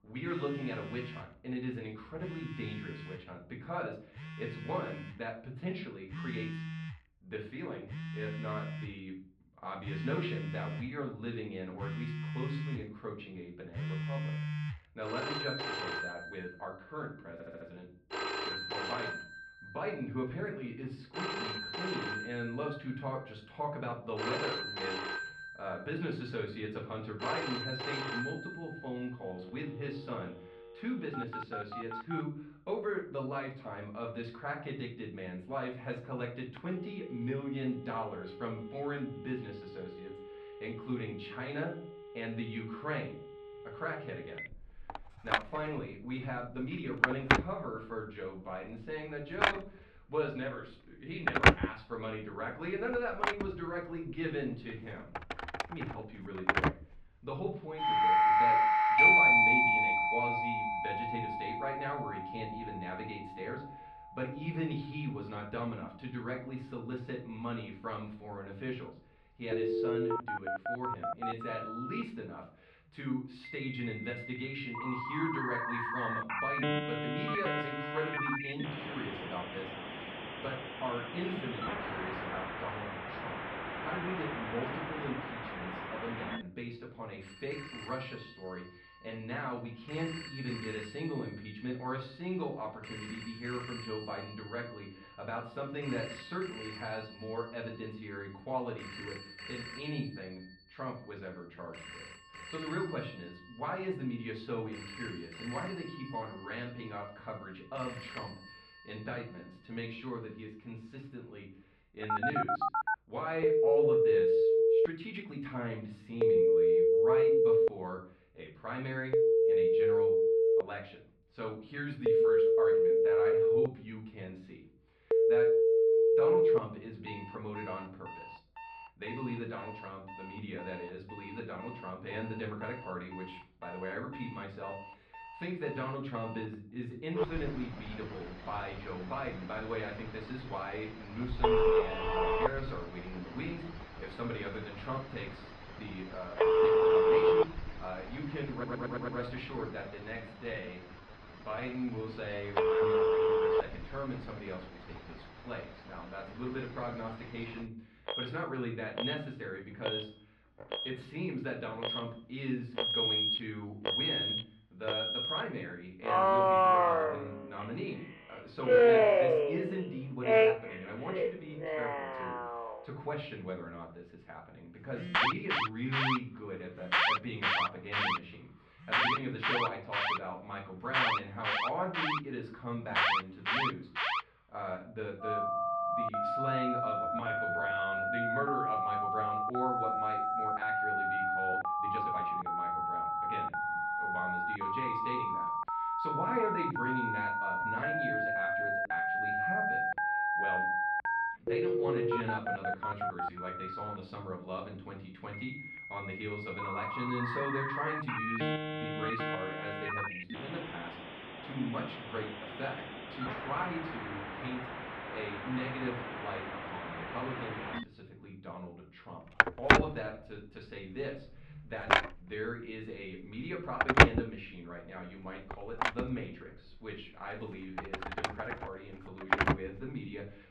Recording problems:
off-mic speech; far
muffled; slightly; fading above 2 kHz
room echo; slight; dies away in 0.4 s
alarms or sirens; very loud; throughout; 9 dB above the speech
uneven, jittery; strongly; from 6 s to 3:40
audio stuttering; at 17 s and at 2:29

